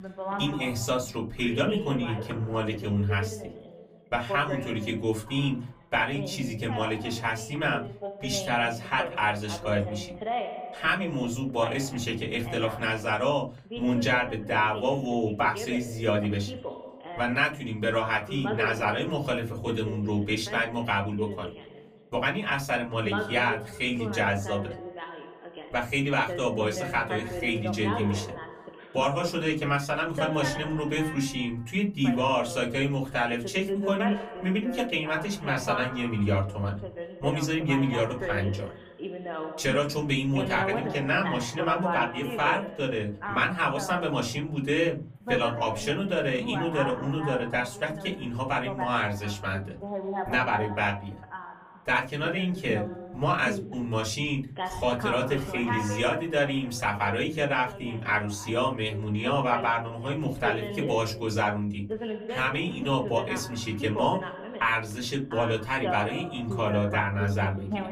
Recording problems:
off-mic speech; far
room echo; very slight; dies away in 0.3 s
voice in the background; loud; throughout; 9 dB below the speech

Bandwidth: 15 kHz